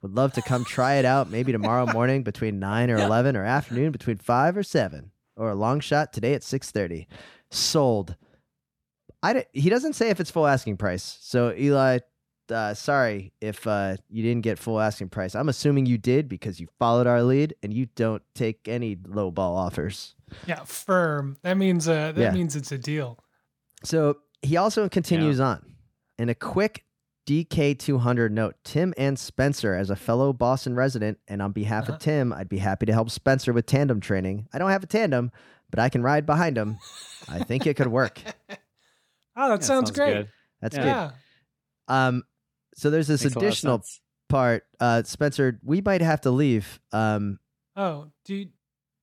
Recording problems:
none

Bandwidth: 17.5 kHz